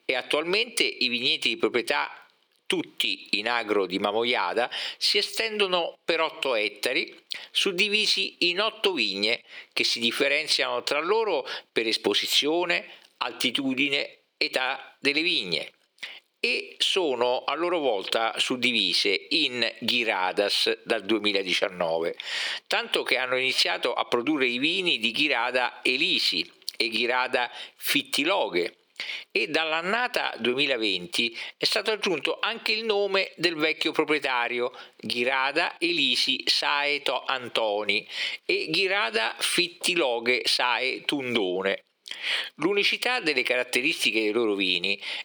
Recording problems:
thin; very slightly; fading below 400 Hz
squashed, flat; somewhat

